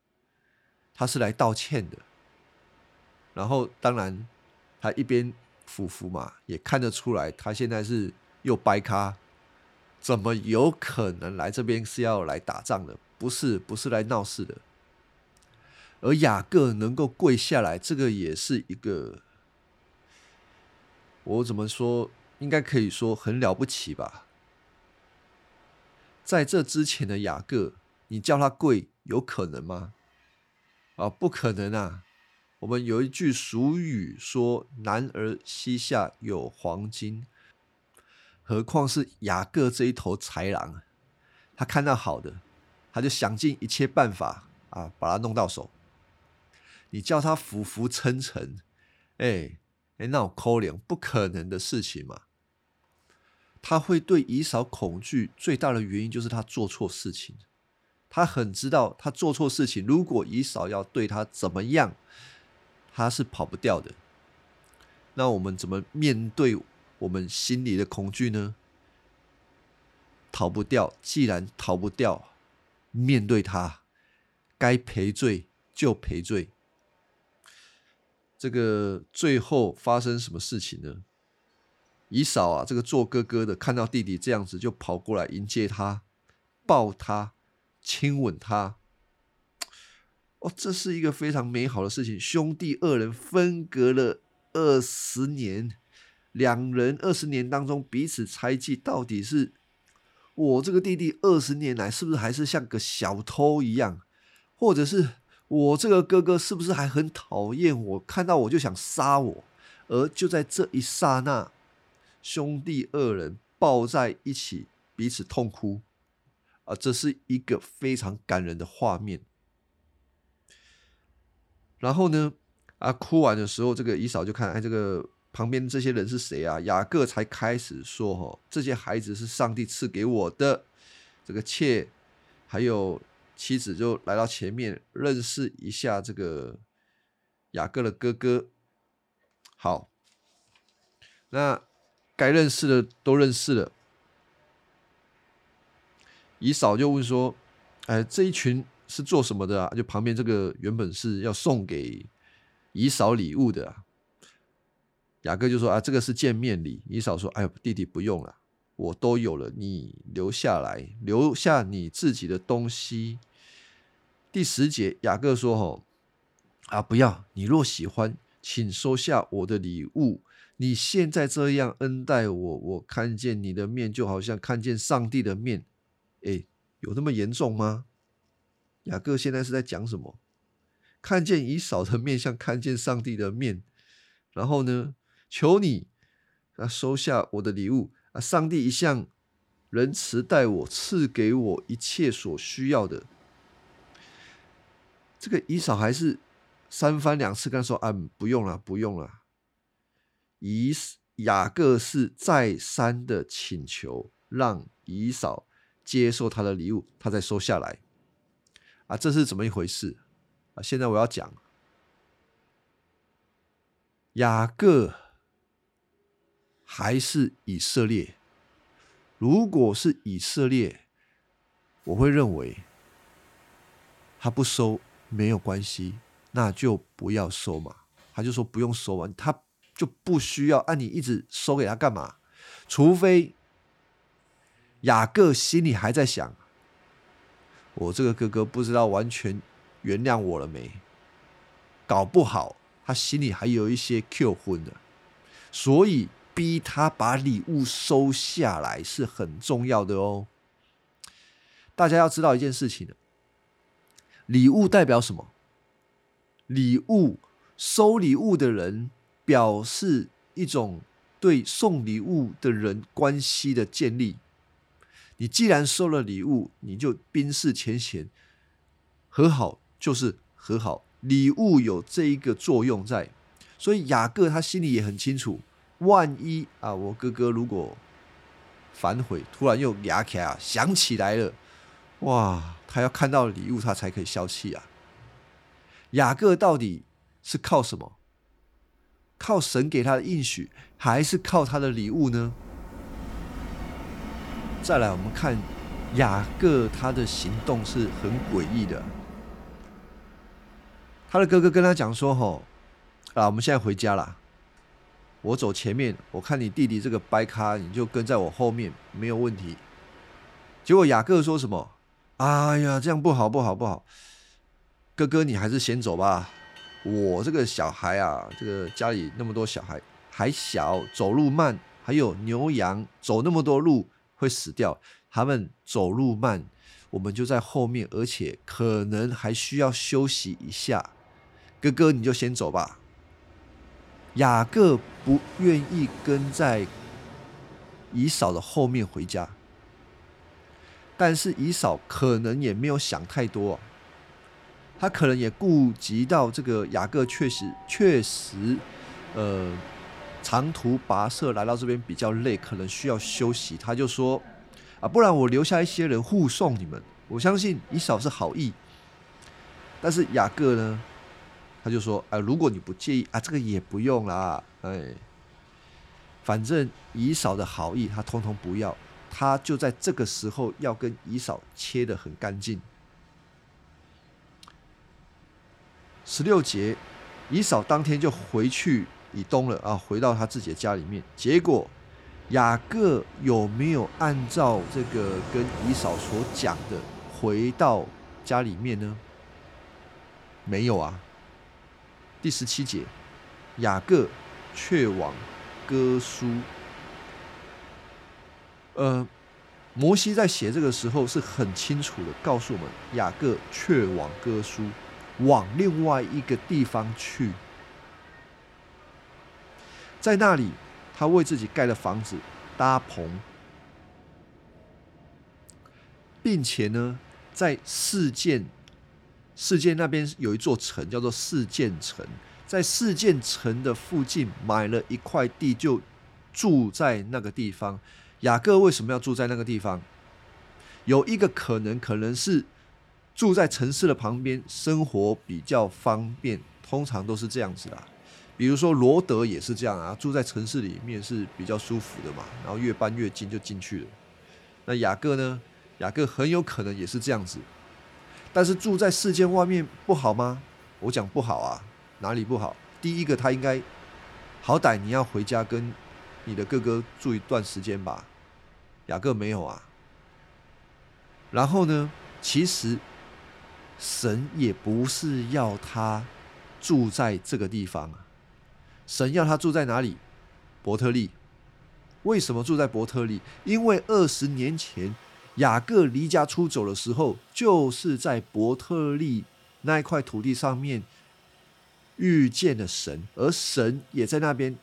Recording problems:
train or aircraft noise; faint; throughout; 20 dB below the speech

